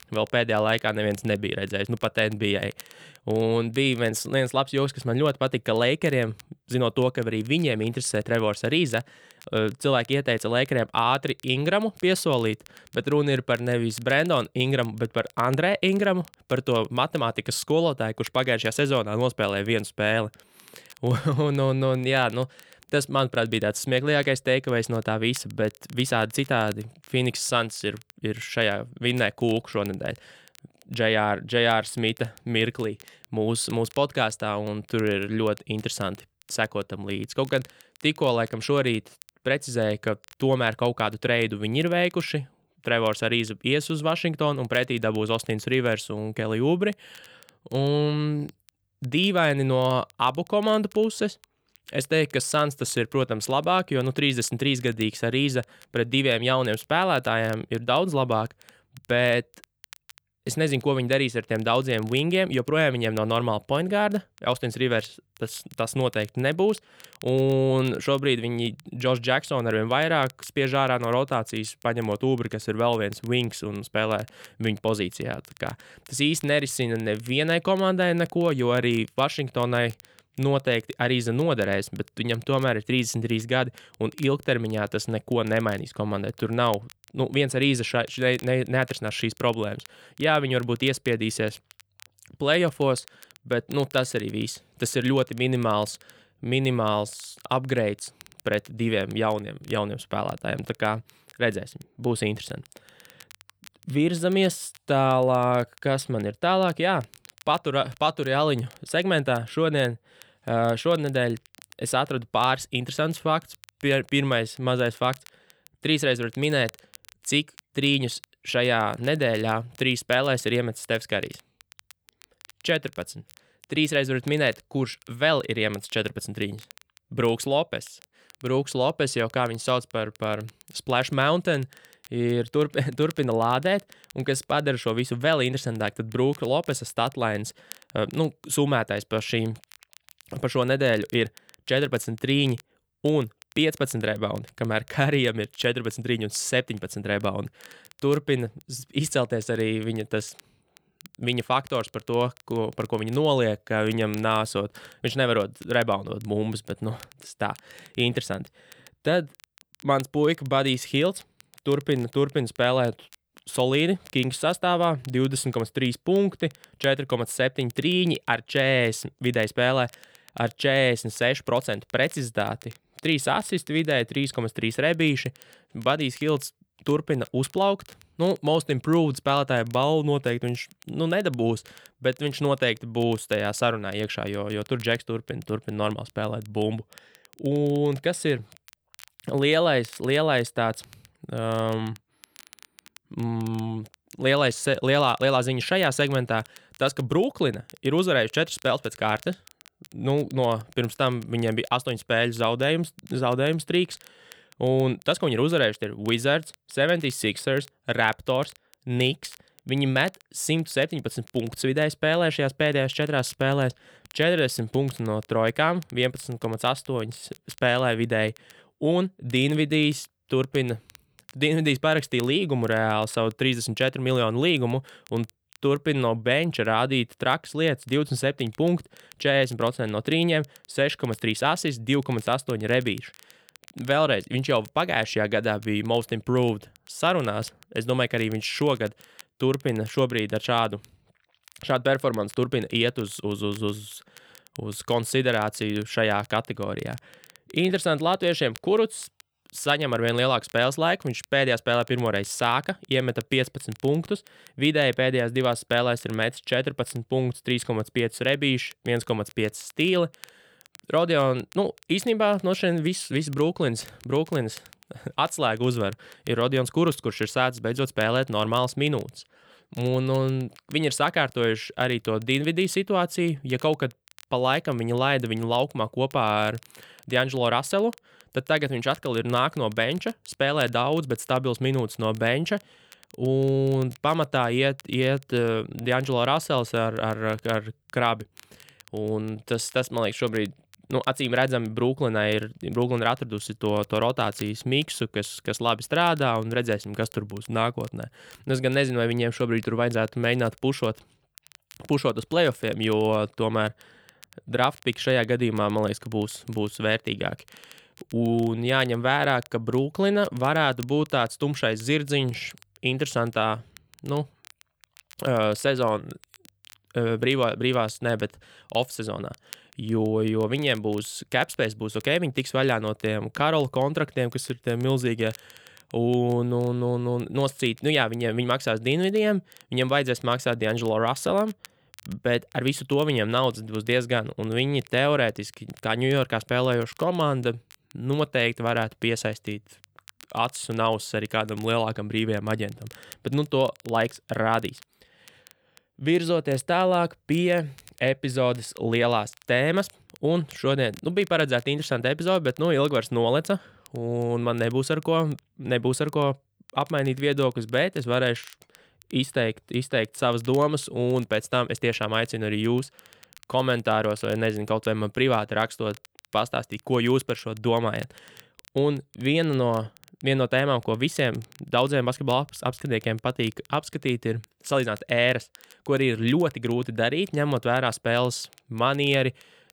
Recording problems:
crackle, like an old record; faint; 25 dB below the speech

